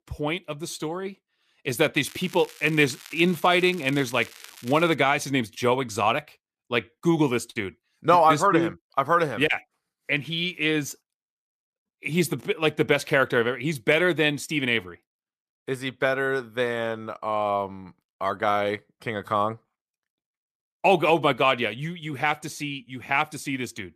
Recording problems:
crackling; noticeable; from 2 to 5 s; 20 dB below the speech

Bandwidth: 14.5 kHz